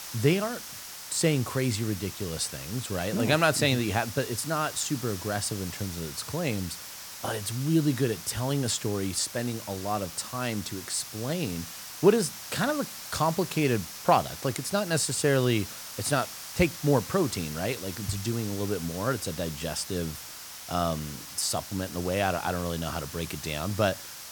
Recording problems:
hiss; loud; throughout; 10 dB below the speech

